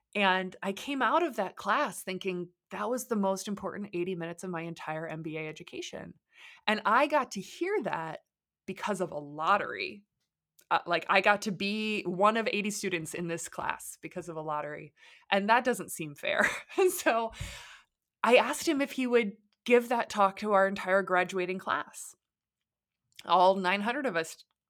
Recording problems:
none

